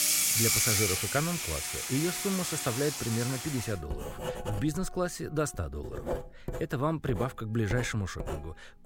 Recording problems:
household noises; very loud; throughout; 2 dB above the speech
background music; faint; throughout; 20 dB below the speech

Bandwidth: 16.5 kHz